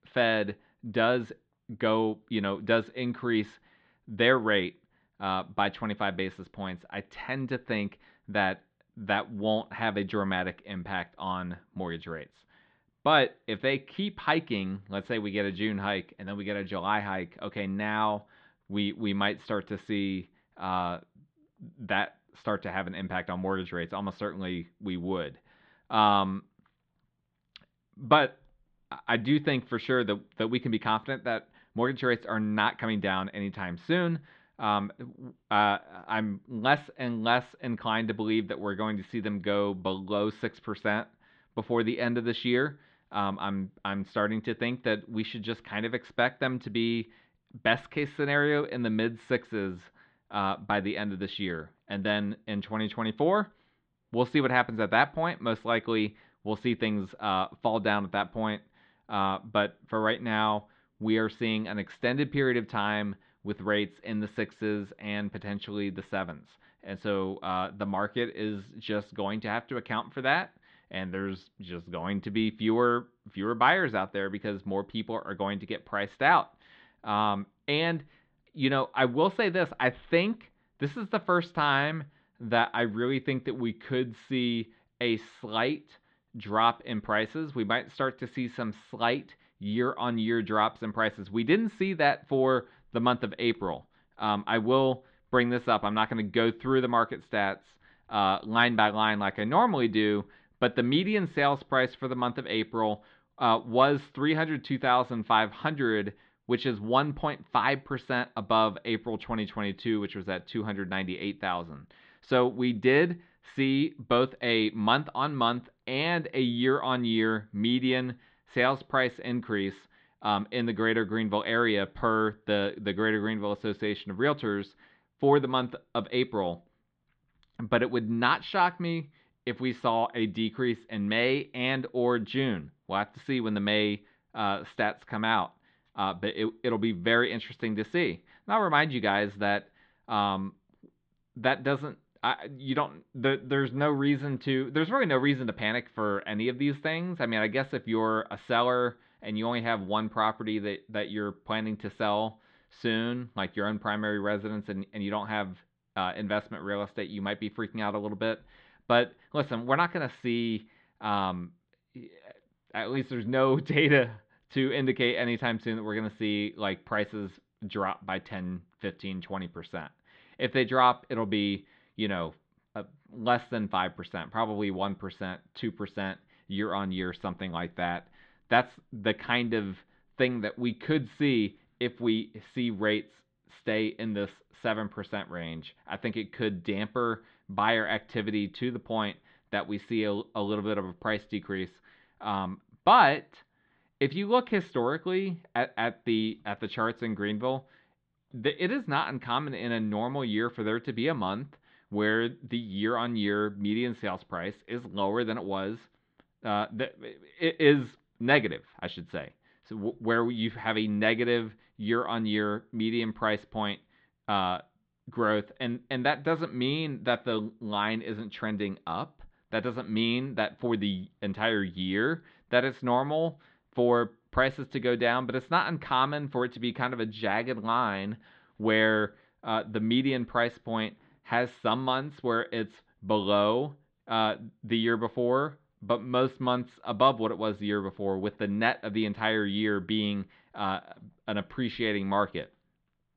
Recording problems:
muffled; slightly; fading above 3.5 kHz

